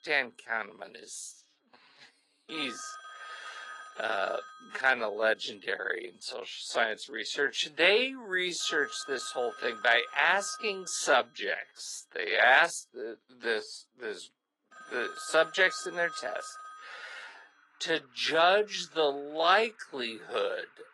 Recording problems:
thin; very; fading below 500 Hz
wrong speed, natural pitch; too slow; 0.6 times normal speed
garbled, watery; slightly; nothing above 11 kHz
alarms or sirens; noticeable; throughout; 20 dB below the speech

